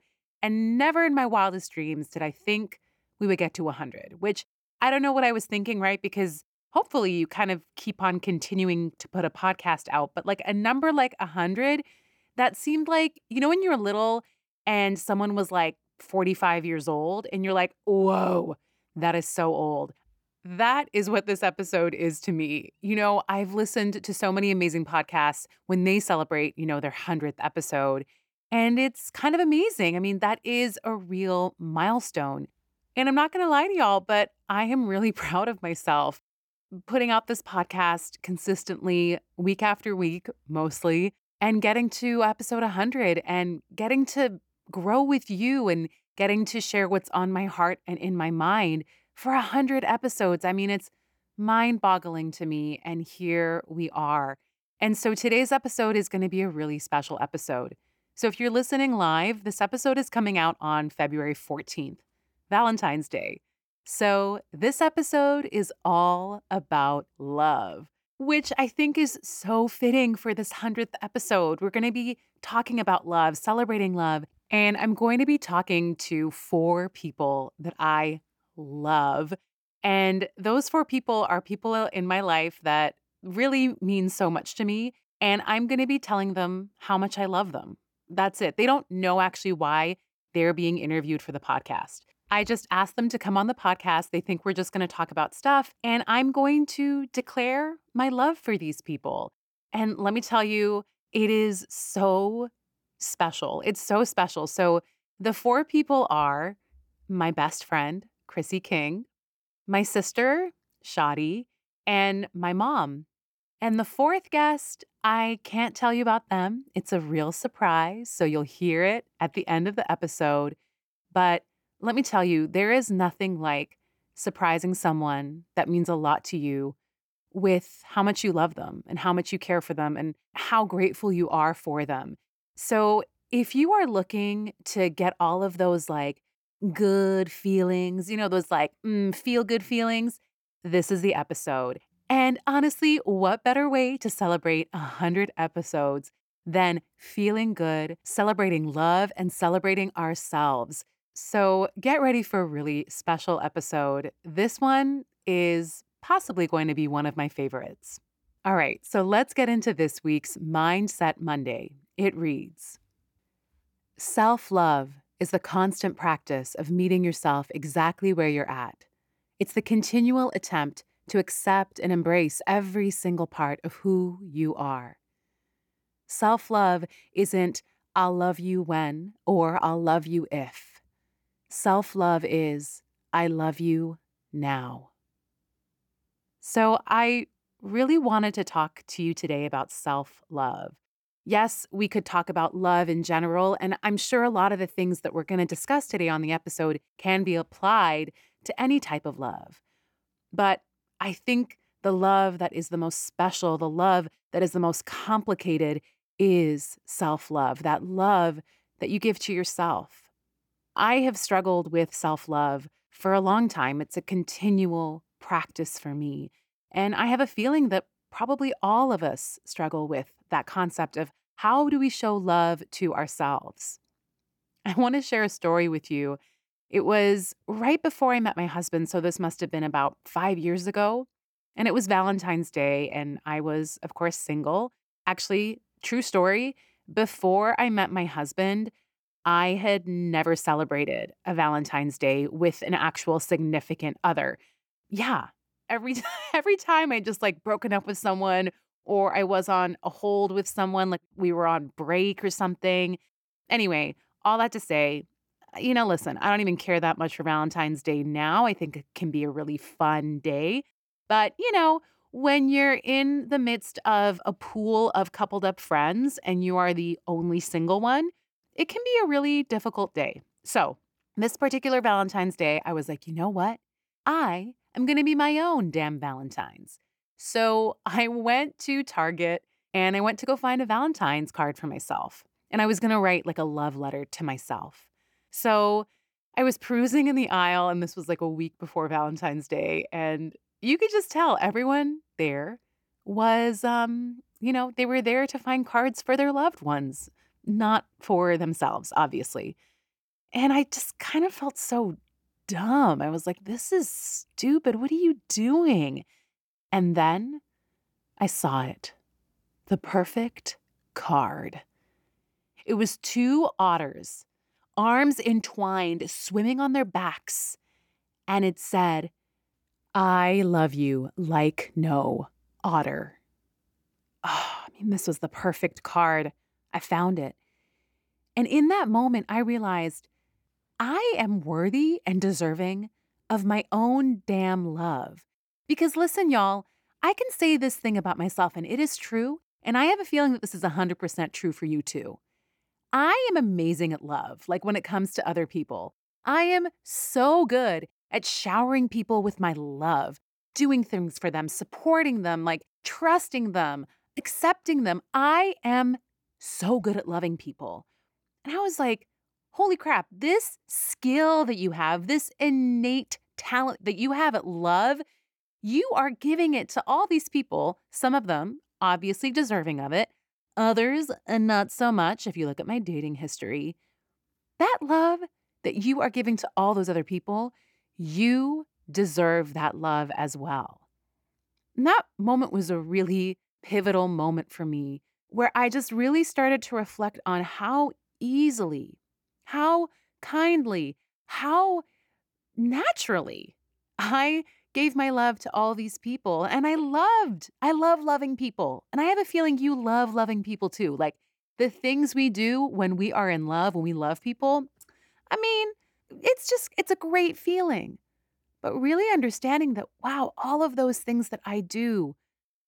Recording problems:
none

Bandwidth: 18.5 kHz